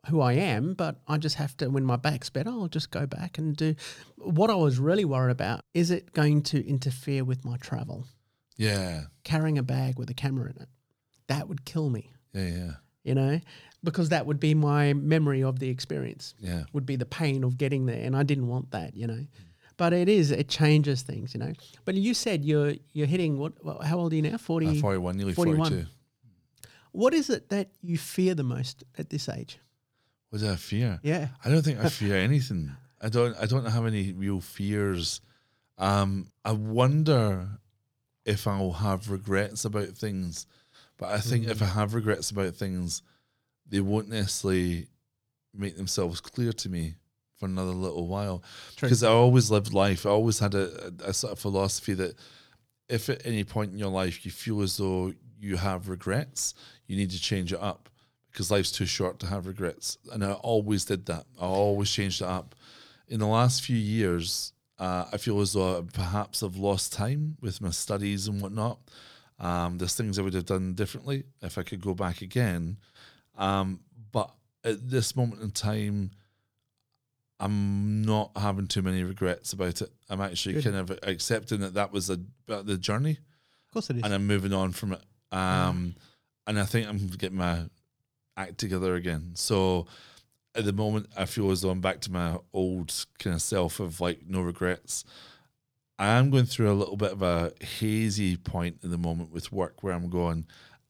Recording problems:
none

